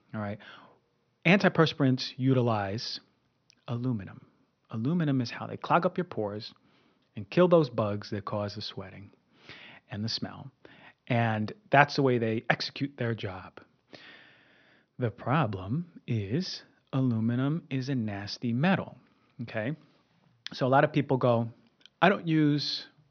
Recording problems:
high frequencies cut off; noticeable; nothing above 6 kHz

